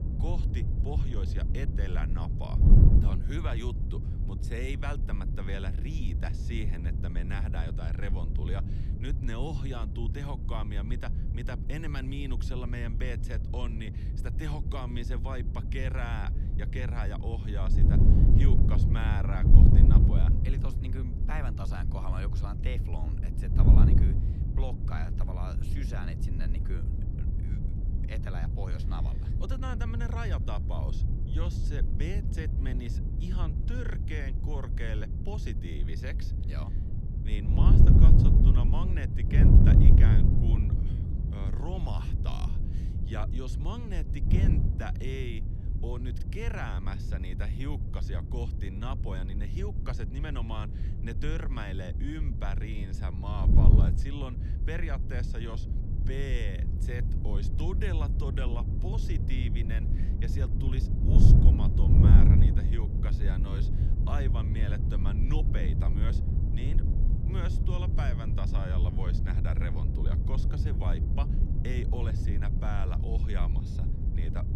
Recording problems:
wind noise on the microphone; heavy; as loud as the speech

